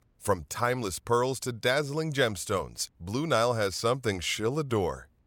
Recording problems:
none

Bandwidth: 17 kHz